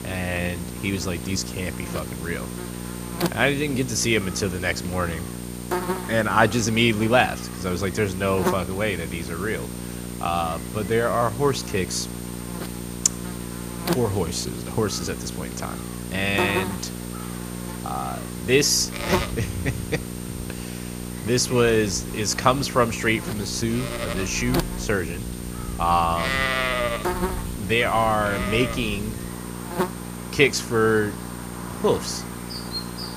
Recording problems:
animal sounds; loud; from 19 s on; 8 dB below the speech
electrical hum; noticeable; throughout; 60 Hz, 10 dB below the speech

